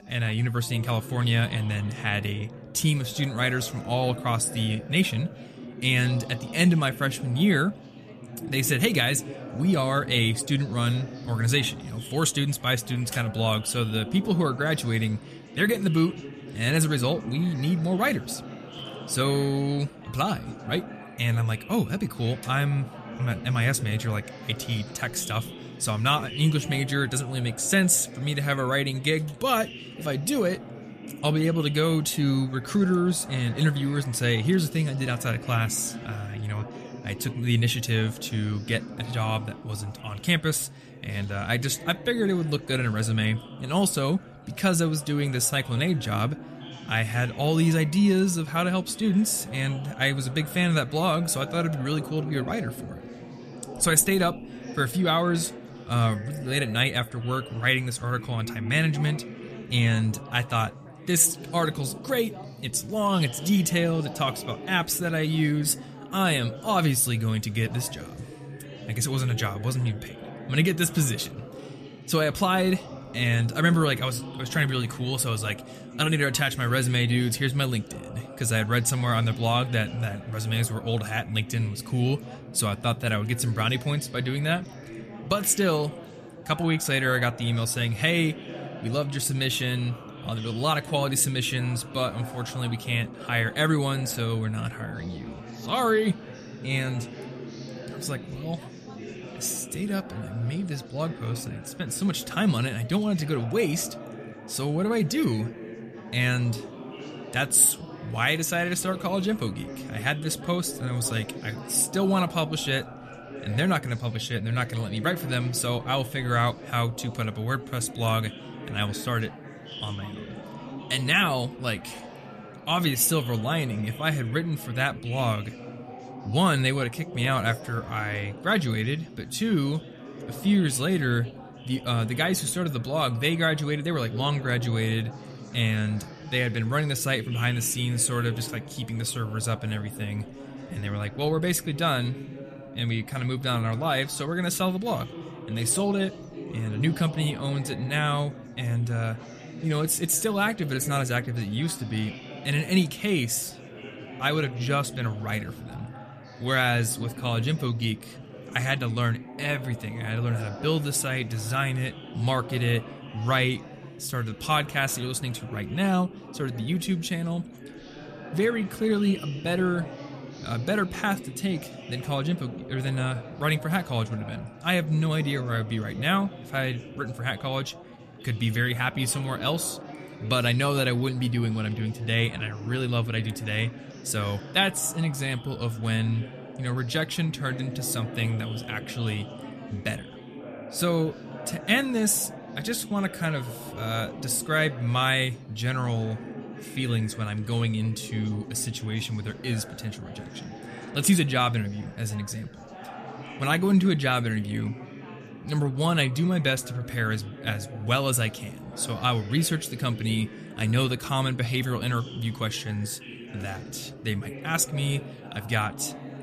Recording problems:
chatter from many people; noticeable; throughout; 15 dB below the speech

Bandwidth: 14.5 kHz